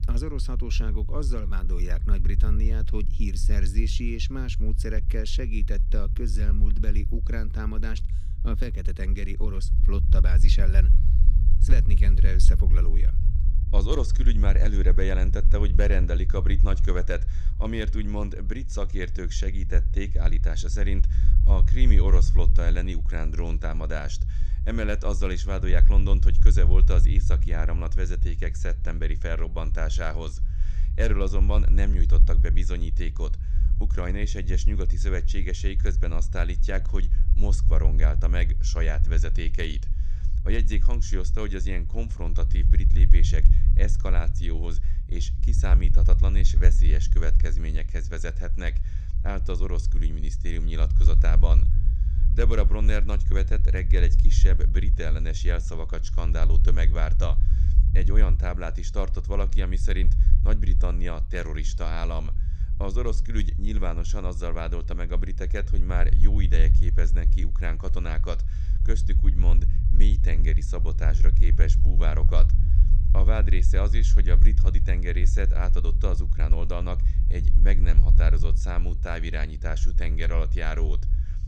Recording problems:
low rumble; loud; throughout; 10 dB below the speech

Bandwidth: 15 kHz